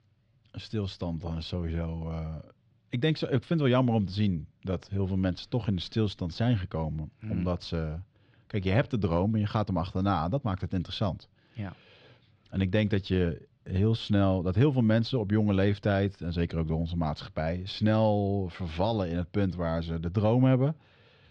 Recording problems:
muffled; slightly; fading above 3 kHz

